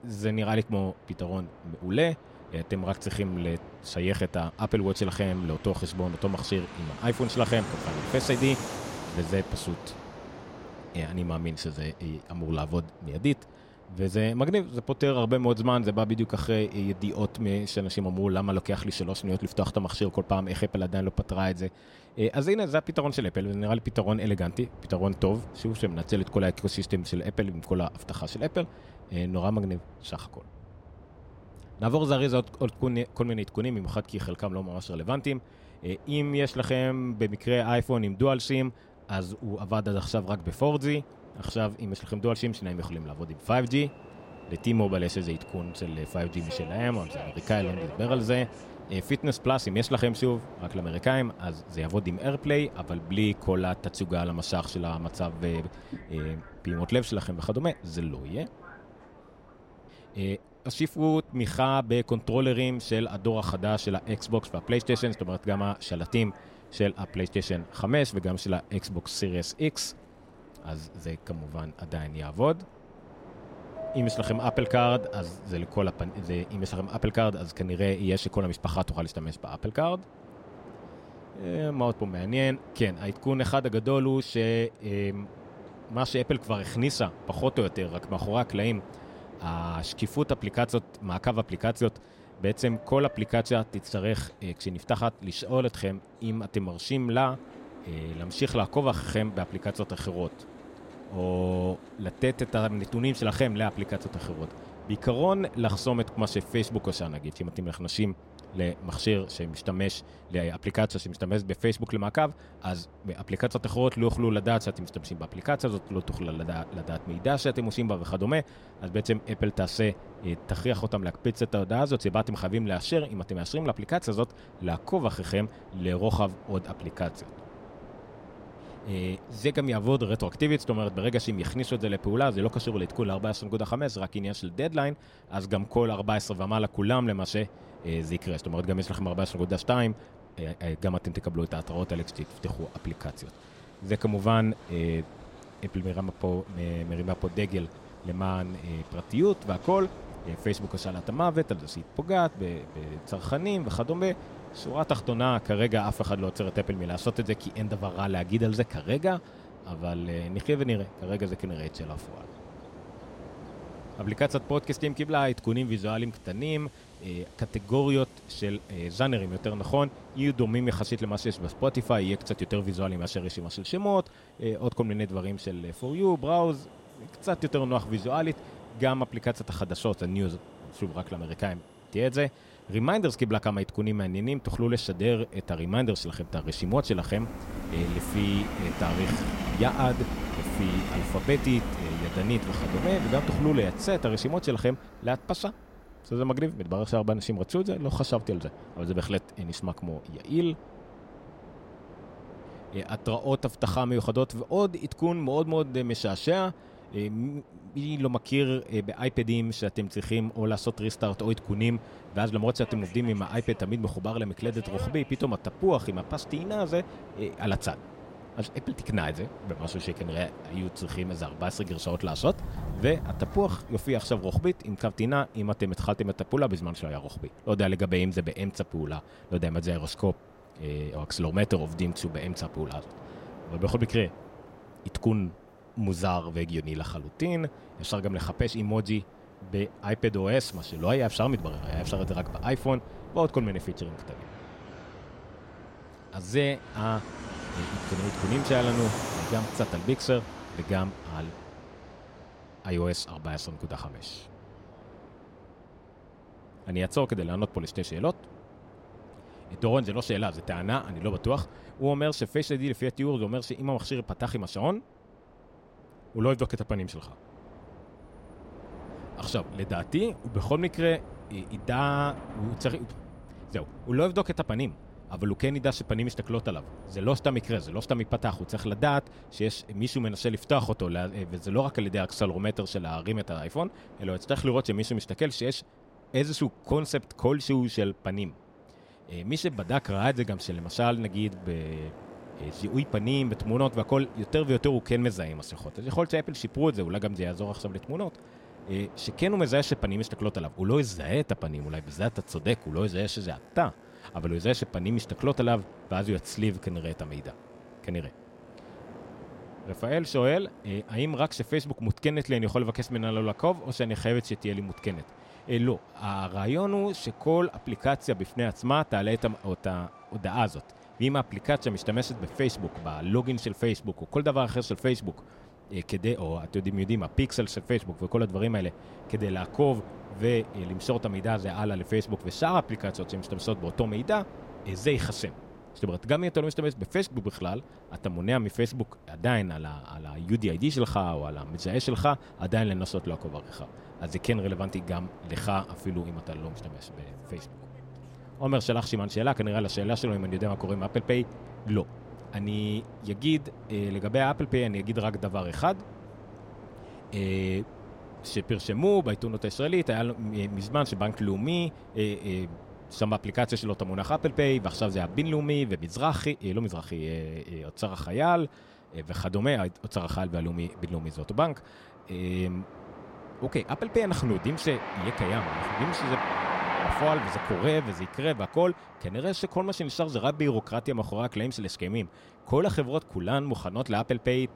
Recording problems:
train or aircraft noise; noticeable; throughout; 15 dB below the speech

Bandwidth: 16 kHz